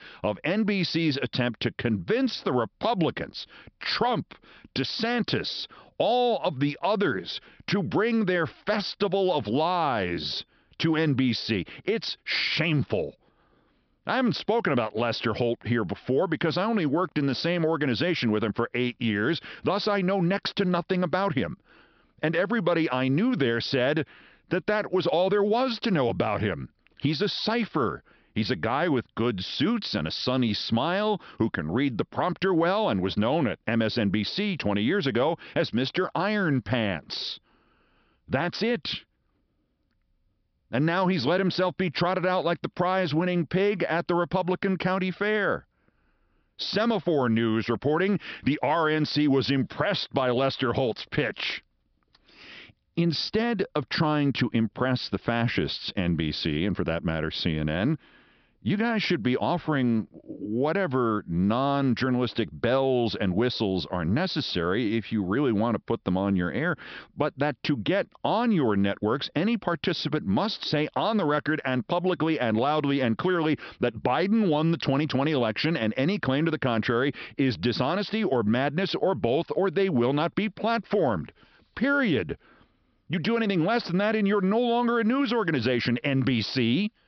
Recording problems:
high frequencies cut off; noticeable; nothing above 5.5 kHz

